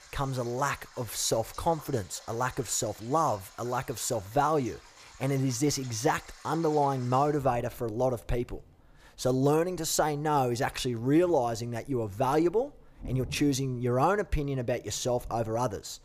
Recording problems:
rain or running water; faint; throughout; 20 dB below the speech

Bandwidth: 15 kHz